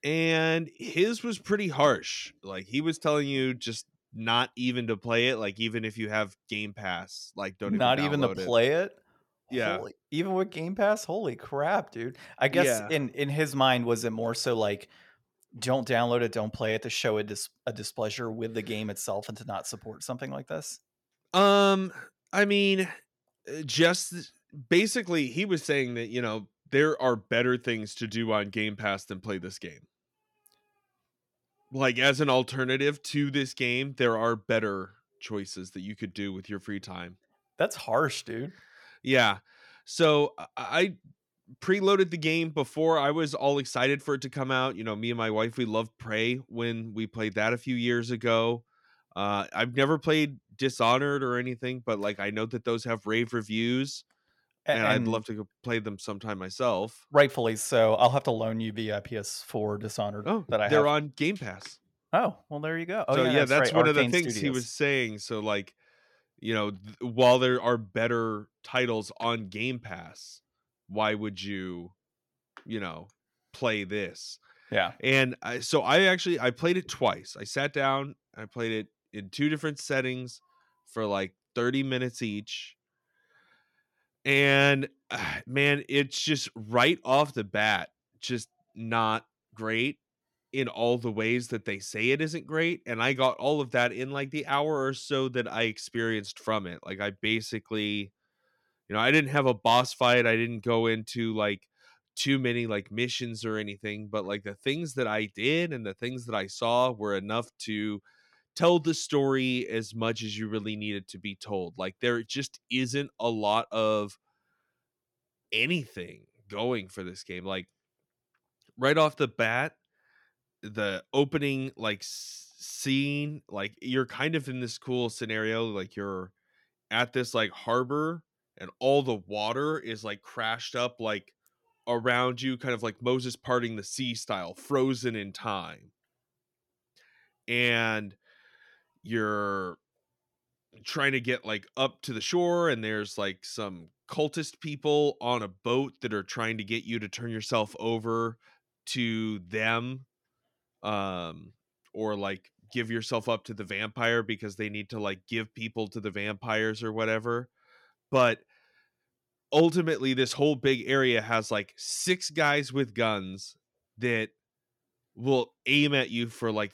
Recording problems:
none

